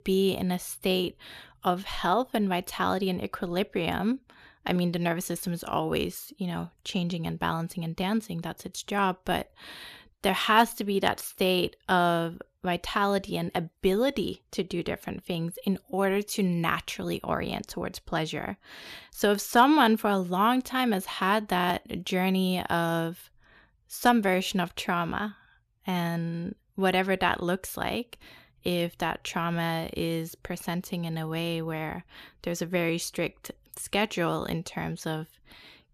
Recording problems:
none

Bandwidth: 14 kHz